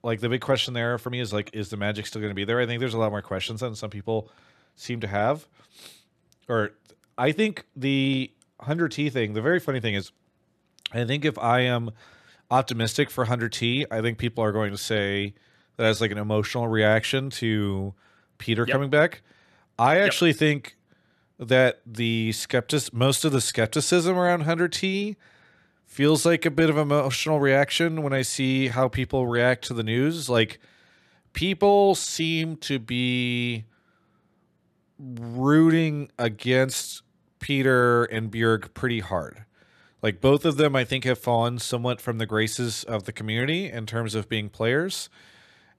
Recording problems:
uneven, jittery; slightly; from 1 to 41 s

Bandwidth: 13.5 kHz